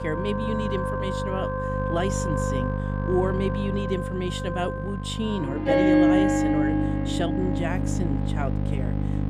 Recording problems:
background music; very loud; throughout; 3 dB above the speech
electrical hum; loud; throughout; 50 Hz, 7 dB below the speech

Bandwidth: 15 kHz